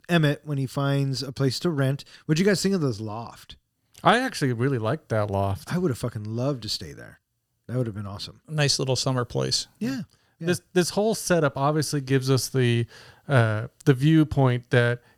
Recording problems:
none

